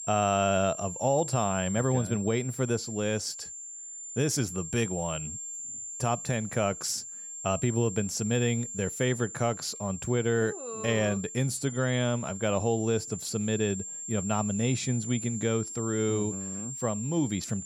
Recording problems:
high-pitched whine; loud; throughout; 7.5 kHz, 8 dB below the speech

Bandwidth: 18 kHz